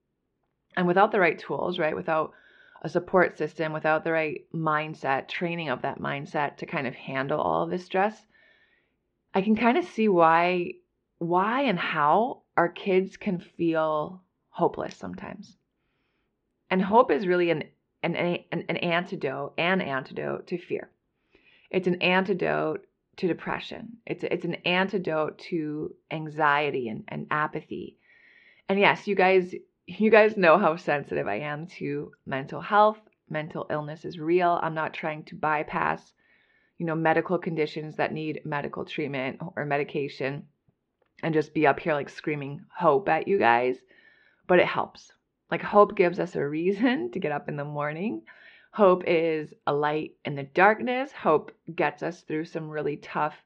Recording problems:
muffled; very; fading above 3.5 kHz

